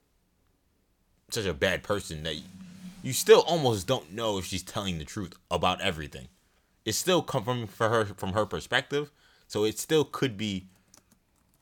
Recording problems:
none

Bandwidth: 18.5 kHz